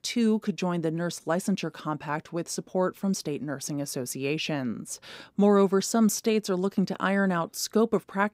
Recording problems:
none

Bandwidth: 15.5 kHz